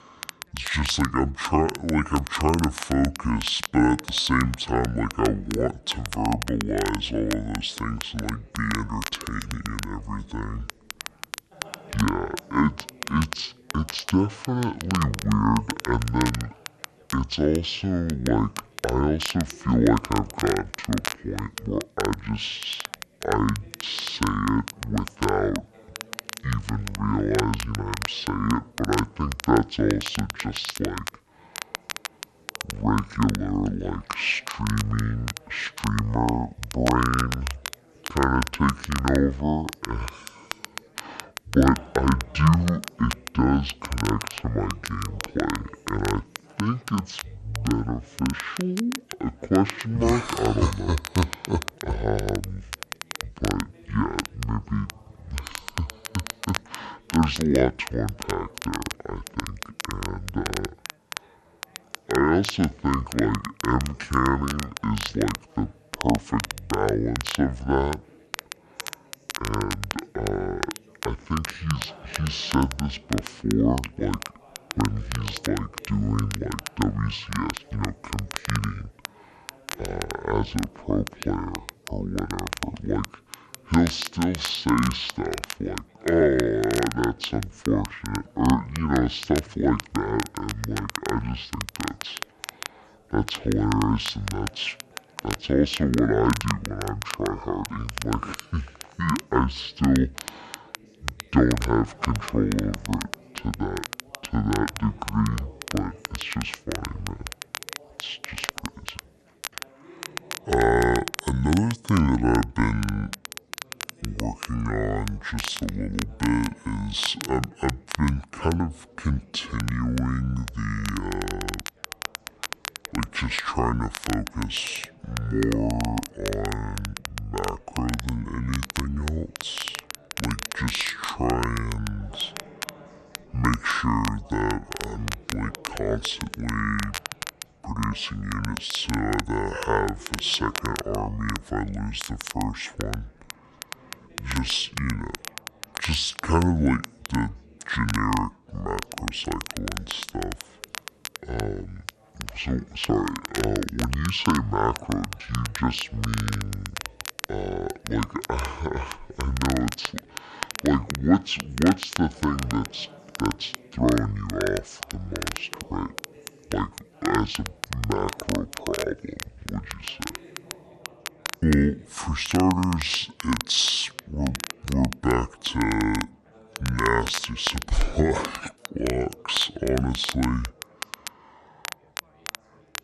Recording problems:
wrong speed and pitch; too slow and too low; 0.6 times normal speed
crackle, like an old record; loud; 10 dB below the speech
background chatter; faint; throughout; 3 voices, 25 dB below the speech

